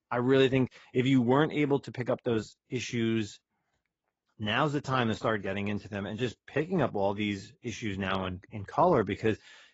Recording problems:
garbled, watery; badly; nothing above 7.5 kHz

